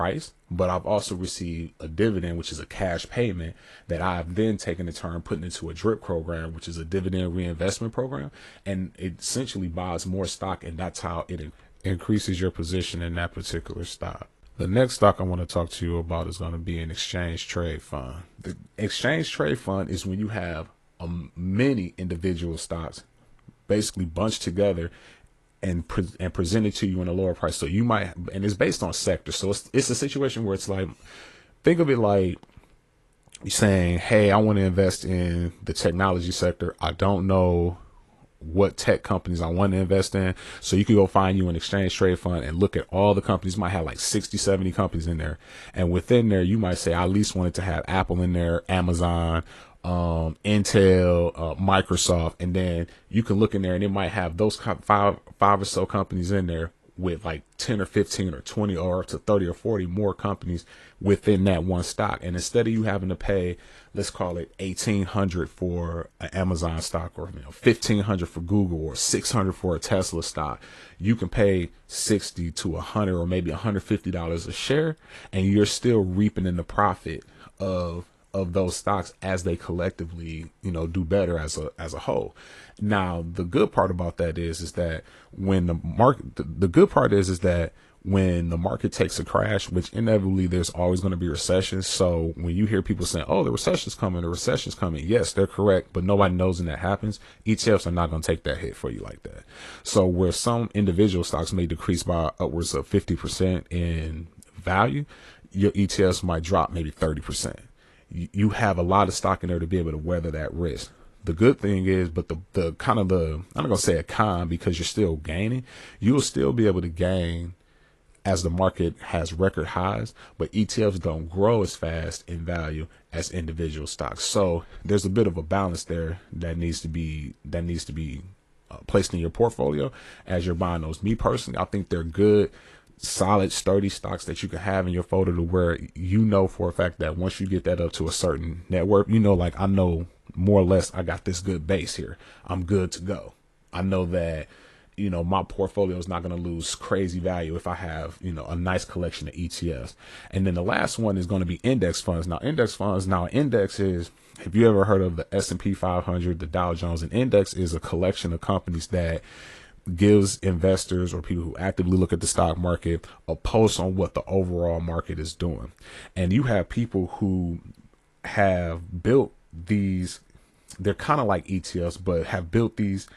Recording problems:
garbled, watery; slightly; nothing above 11.5 kHz
abrupt cut into speech; at the start

